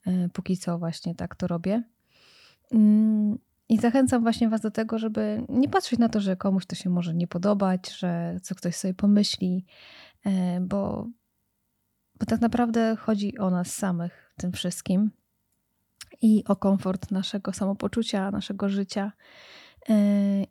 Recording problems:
none

